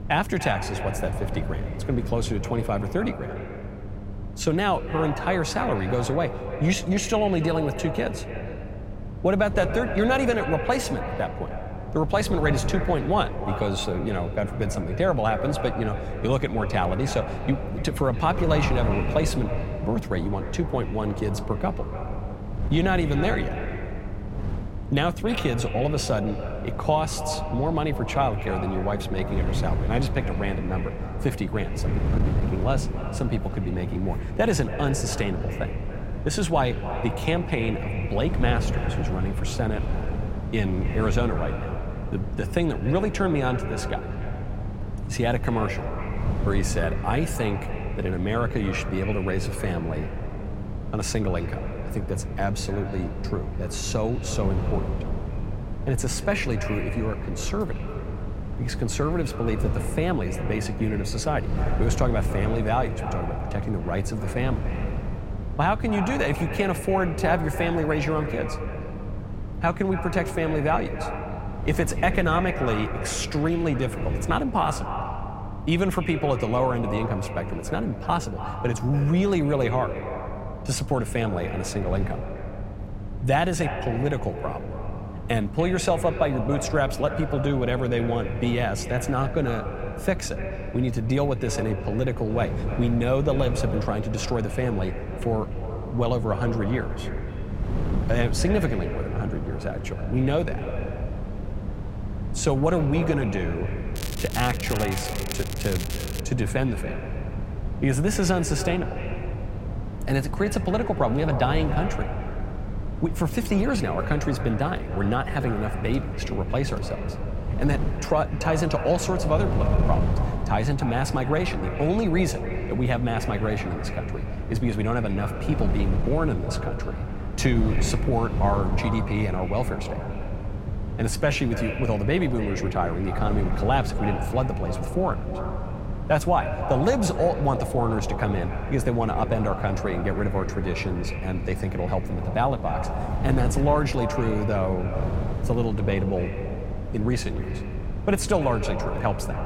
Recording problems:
echo of what is said; strong; throughout; 290 ms later, 10 dB below the speech
crackling; loud; from 1:44 to 1:46; 9 dB below the speech
wind noise on the microphone; occasional gusts; 15 dB below the speech
electrical hum; faint; throughout; 50 Hz, 20 dB below the speech

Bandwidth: 16 kHz